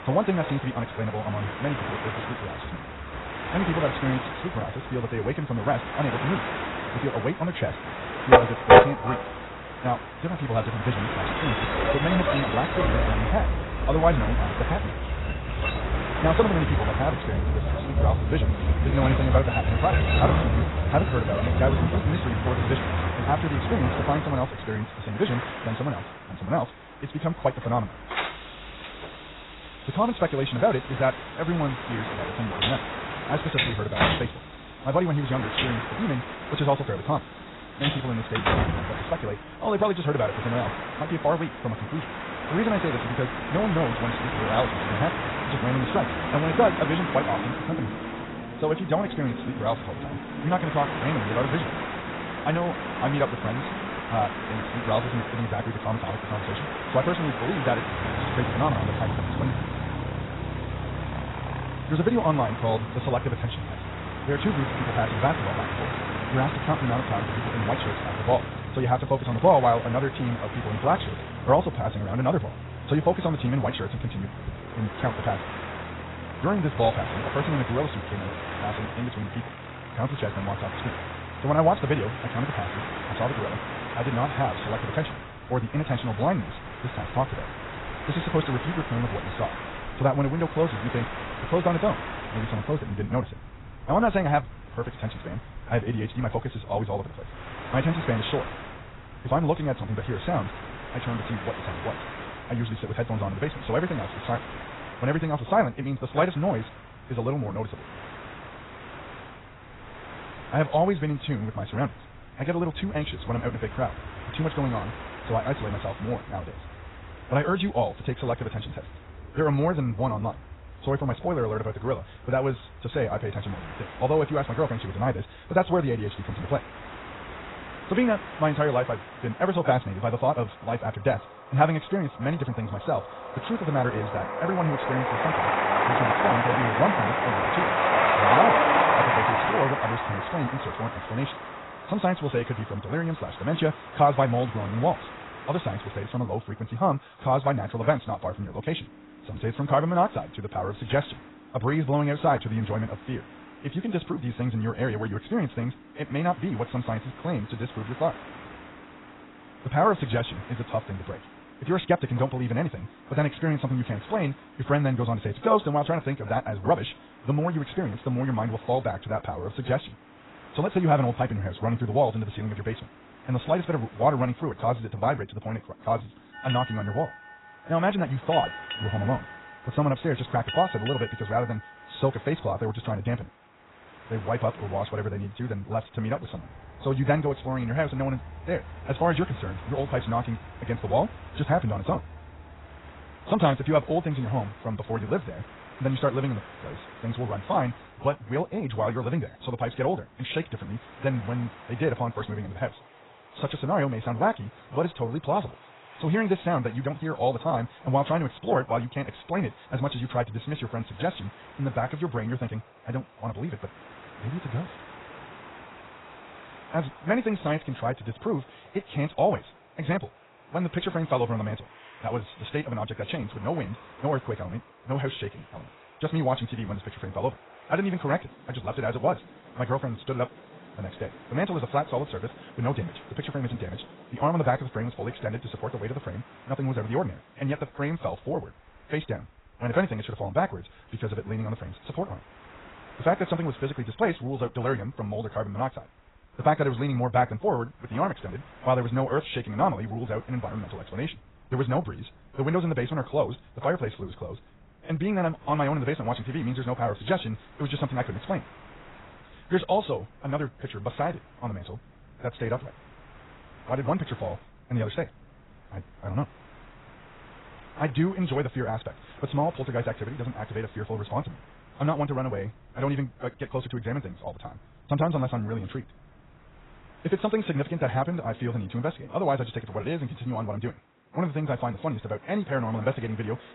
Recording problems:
garbled, watery; badly; nothing above 4 kHz
wrong speed, natural pitch; too fast; 1.6 times normal speed
train or aircraft noise; loud; throughout; 2 dB below the speech

